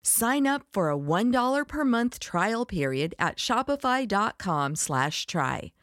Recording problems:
none

